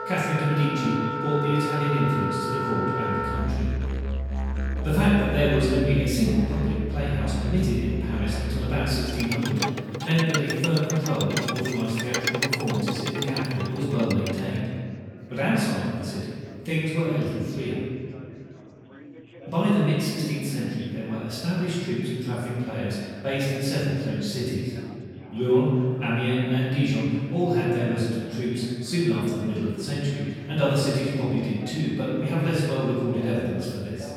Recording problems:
room echo; strong; dies away in 1.9 s
off-mic speech; far
background music; loud; until 14 s; 4 dB below the speech
chatter from many people; faint; throughout; 20 dB below the speech

